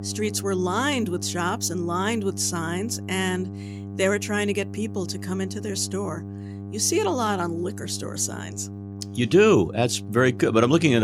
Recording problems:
electrical hum; noticeable; throughout; 50 Hz, 20 dB below the speech
abrupt cut into speech; at the end

